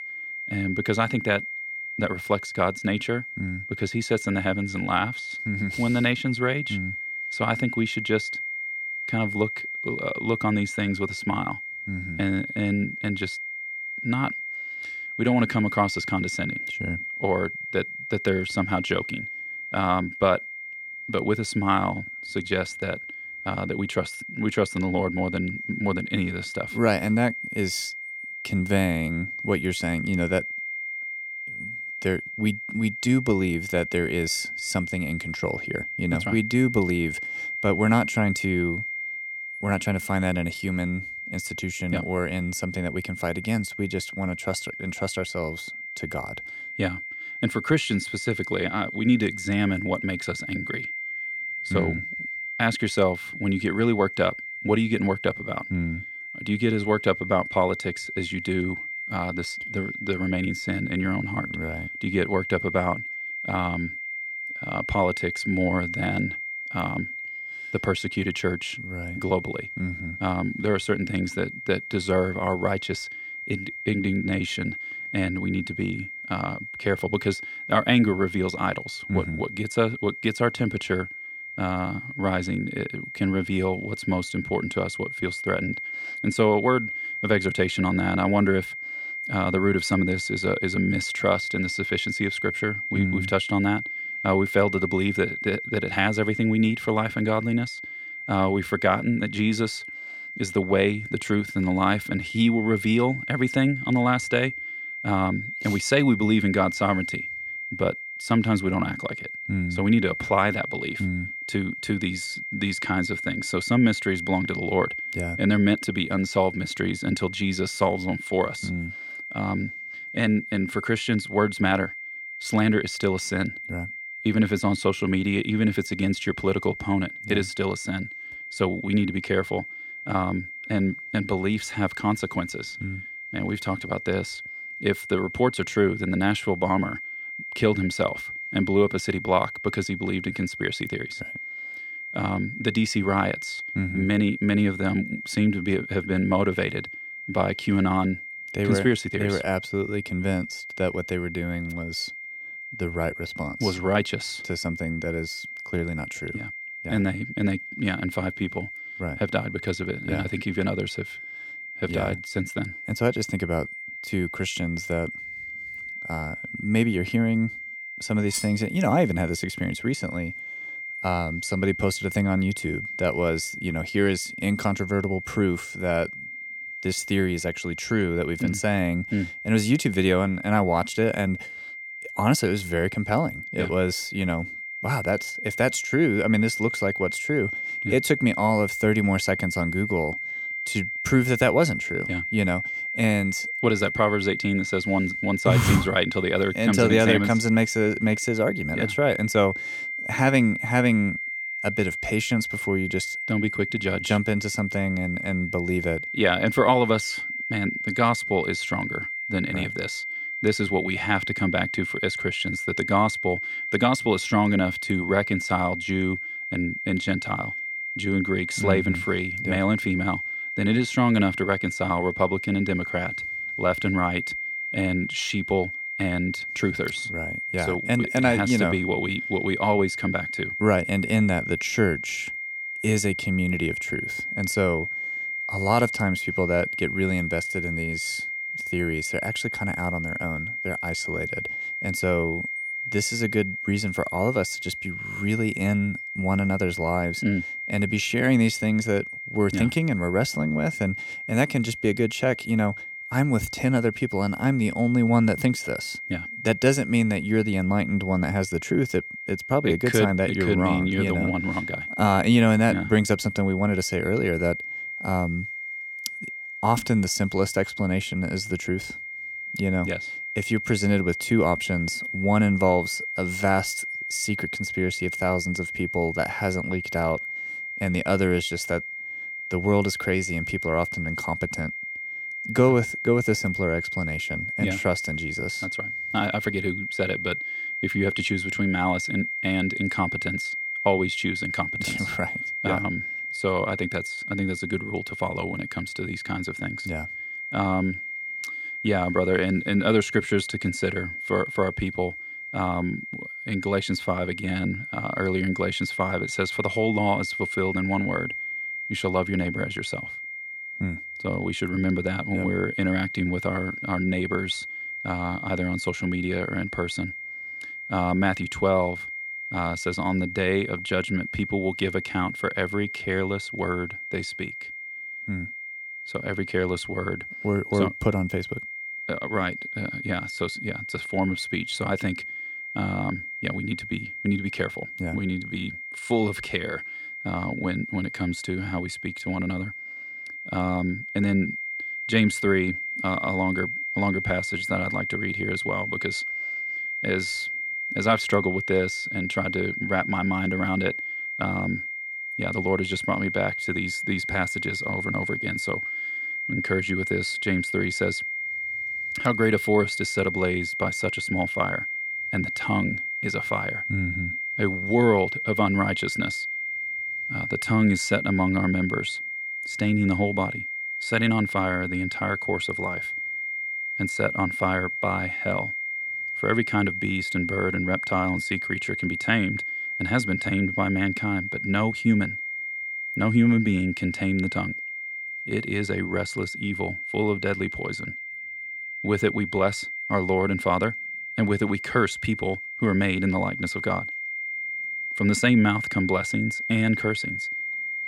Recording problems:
high-pitched whine; loud; throughout; 2 kHz, 5 dB below the speech
clattering dishes; noticeable; at 2:48; peak 5 dB below the speech

